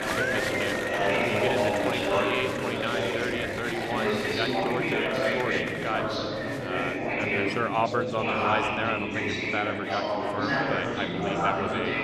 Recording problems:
chatter from many people; very loud; throughout; 5 dB above the speech

